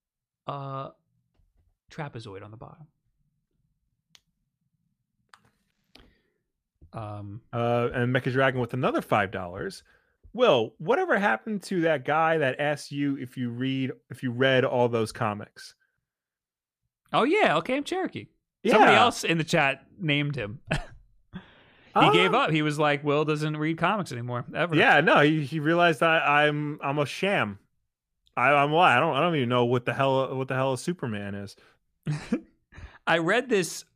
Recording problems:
none

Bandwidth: 15 kHz